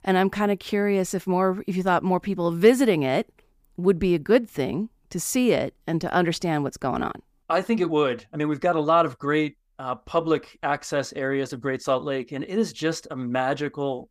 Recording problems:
none

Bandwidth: 15 kHz